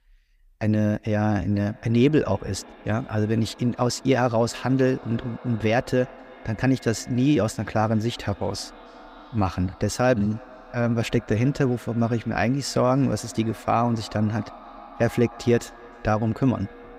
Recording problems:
echo of what is said; faint; throughout; 310 ms later, 20 dB below the speech

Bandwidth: 15.5 kHz